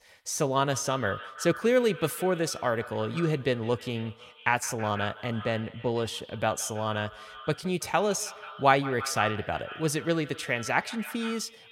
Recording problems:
echo of what is said; noticeable; throughout; 160 ms later, 15 dB below the speech

